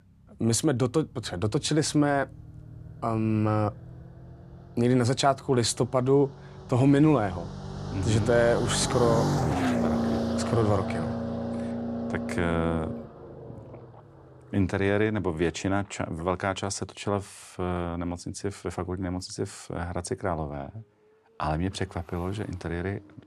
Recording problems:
traffic noise; loud; throughout; 5 dB below the speech

